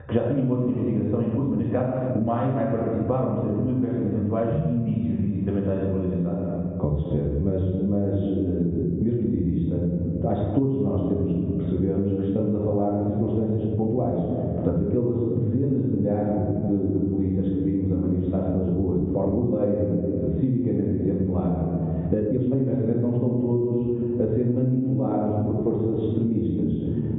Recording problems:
off-mic speech; far
high frequencies cut off; severe; nothing above 3.5 kHz
room echo; noticeable; dies away in 1.4 s
muffled; very slightly; fading above 1.5 kHz
squashed, flat; somewhat
uneven, jittery; strongly; from 1.5 to 26 s

